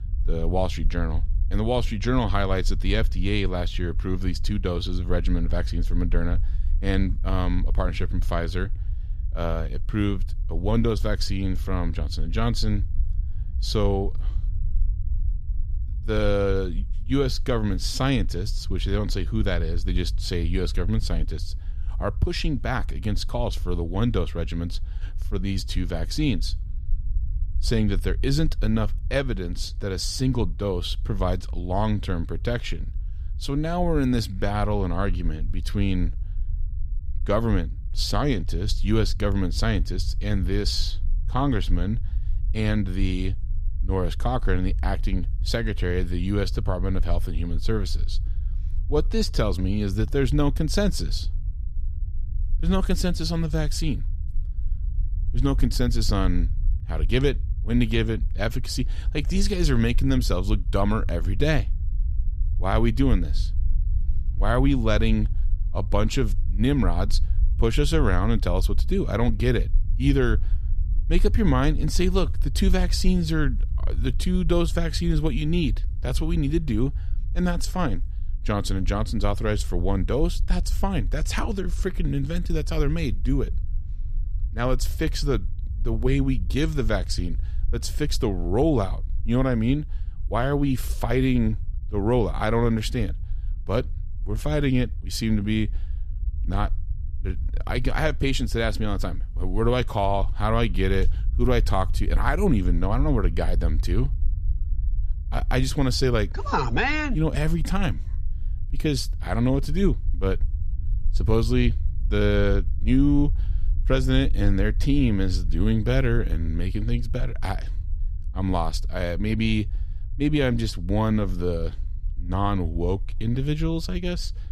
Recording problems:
low rumble; faint; throughout; 20 dB below the speech

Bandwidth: 14.5 kHz